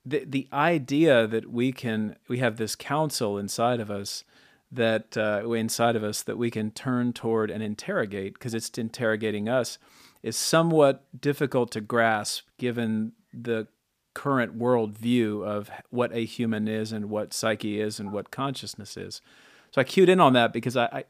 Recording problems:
none

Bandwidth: 15 kHz